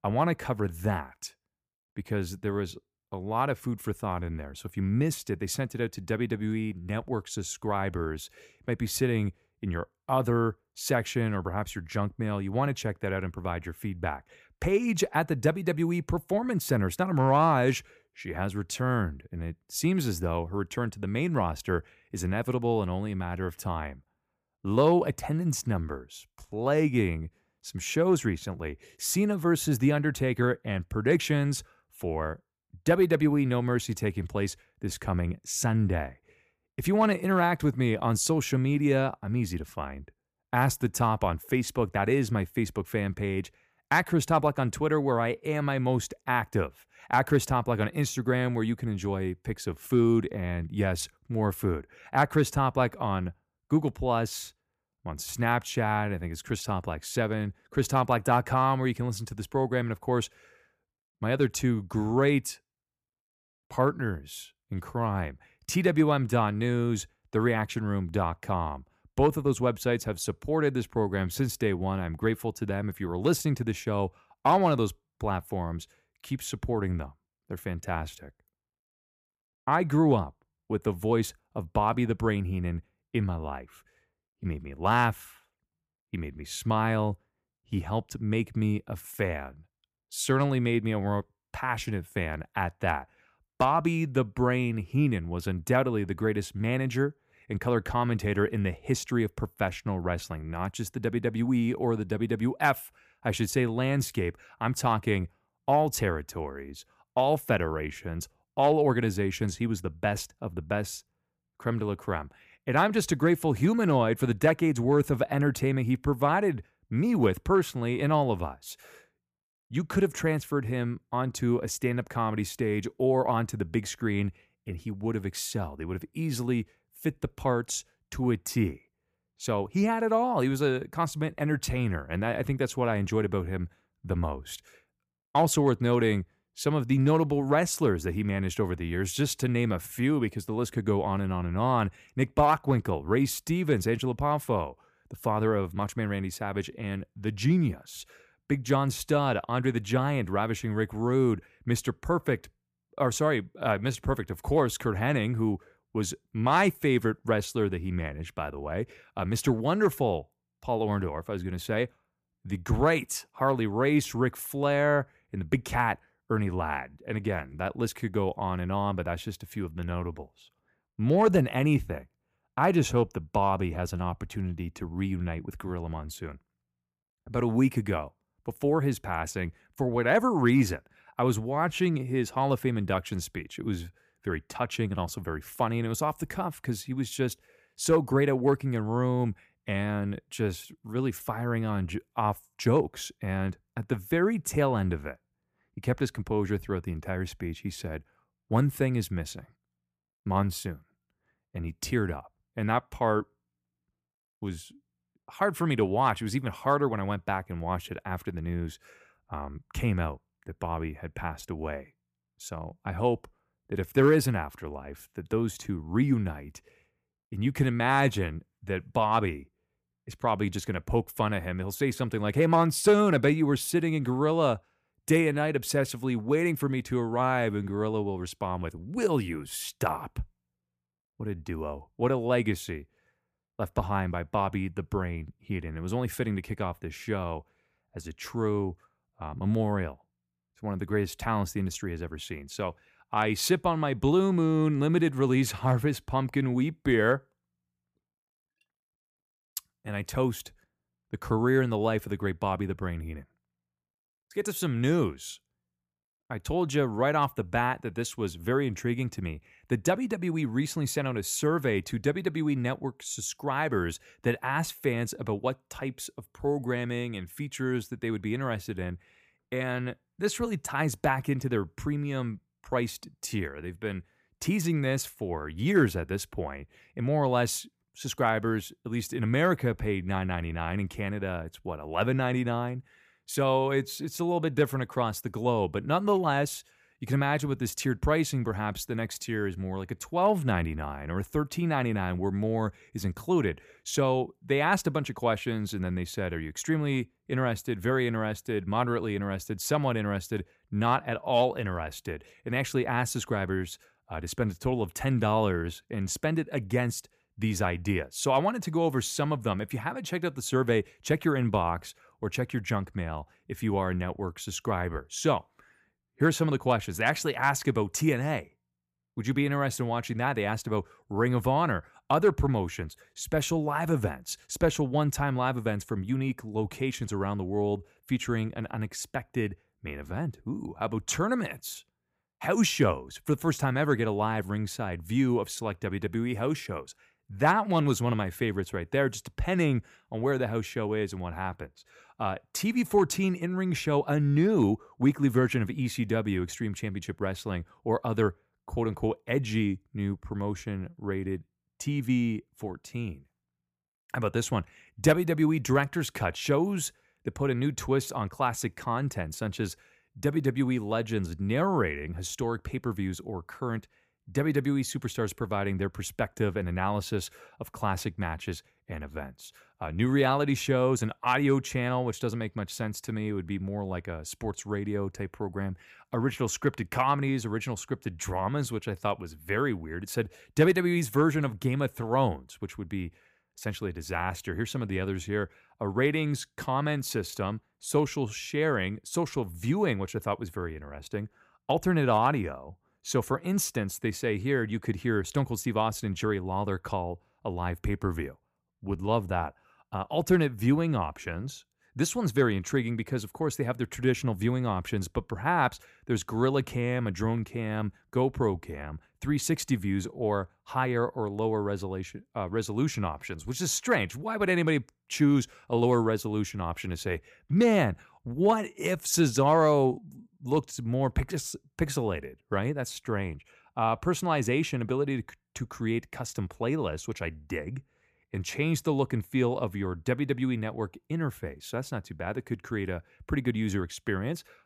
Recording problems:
none

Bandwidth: 15 kHz